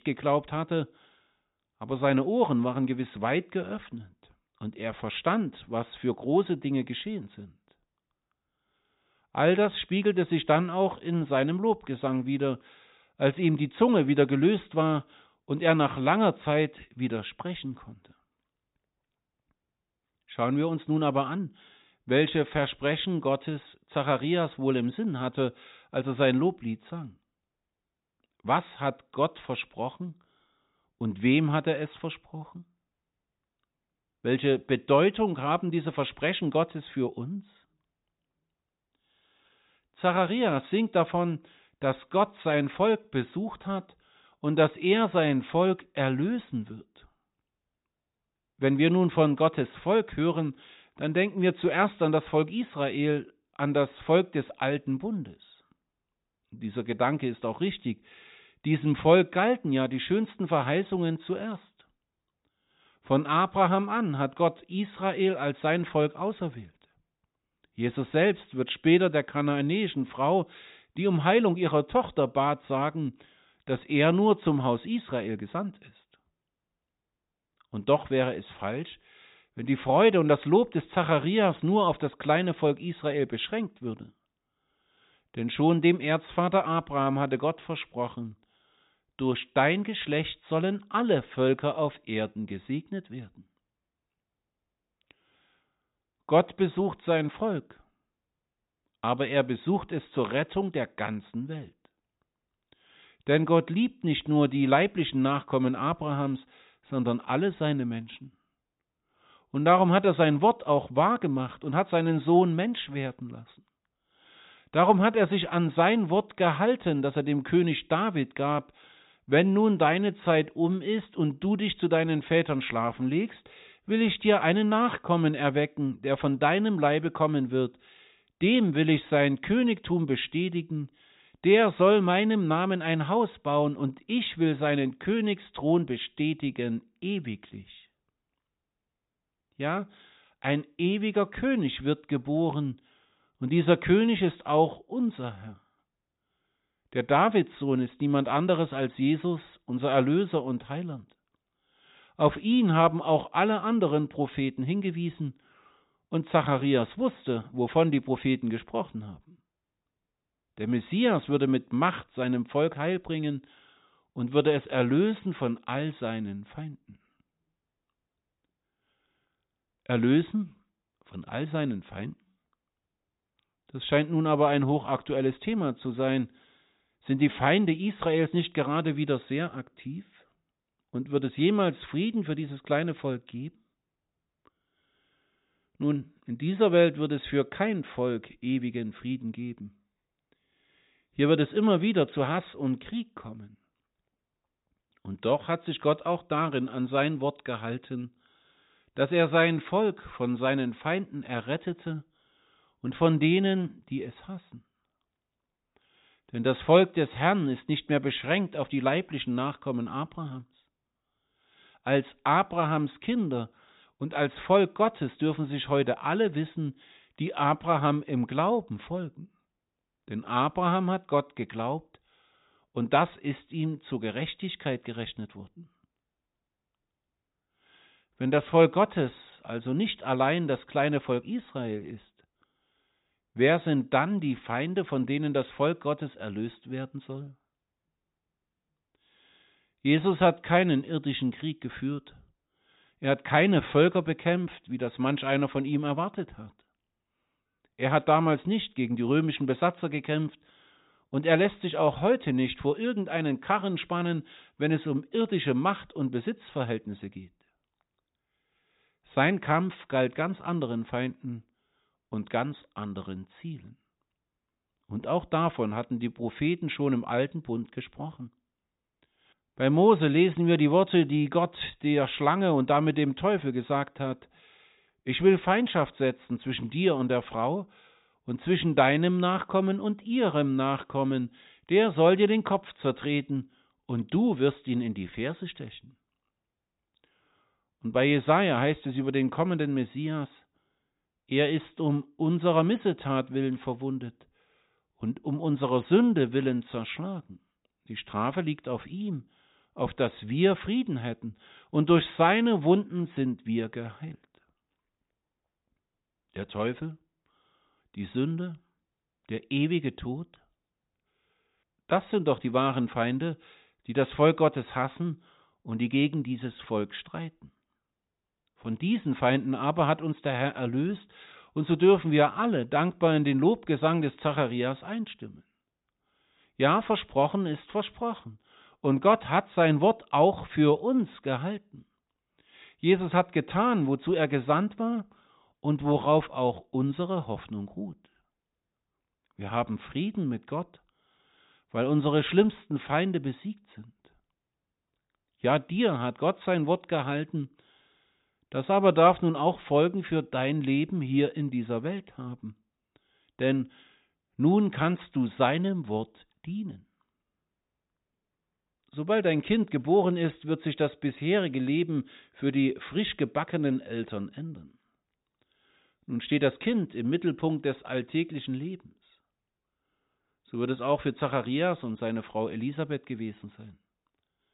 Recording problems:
high frequencies cut off; severe; nothing above 4 kHz

